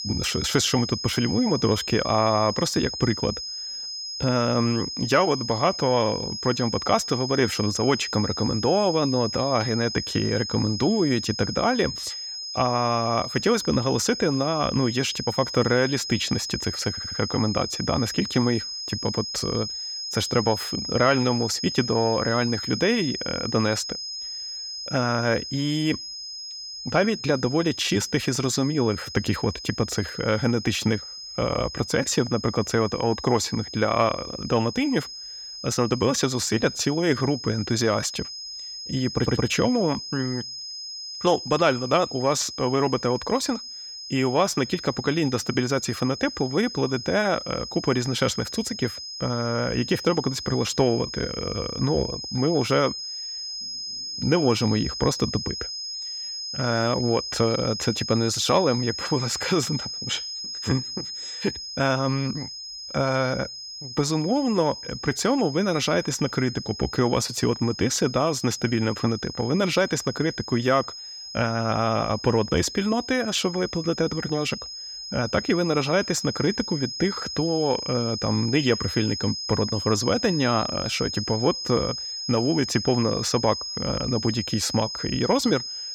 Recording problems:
high-pitched whine; loud; throughout; 5 kHz, 7 dB below the speech
audio stuttering; at 17 s and at 39 s

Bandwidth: 17.5 kHz